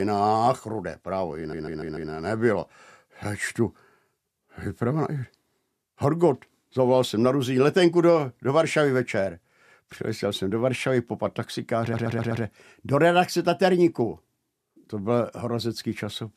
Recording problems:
abrupt cut into speech; at the start
audio stuttering; at 1.5 s and at 12 s

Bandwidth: 14.5 kHz